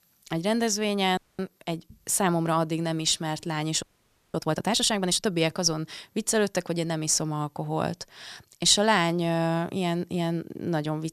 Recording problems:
audio freezing; at 1 s and at 4 s for 0.5 s

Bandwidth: 14.5 kHz